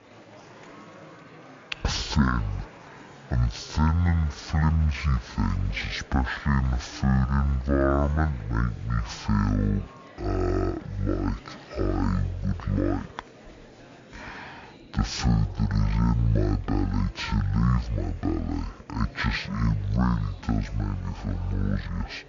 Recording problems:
wrong speed and pitch; too slow and too low; 0.5 times normal speed
murmuring crowd; faint; throughout; 20 dB below the speech

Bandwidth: 7 kHz